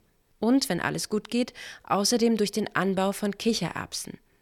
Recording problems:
none

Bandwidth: 18.5 kHz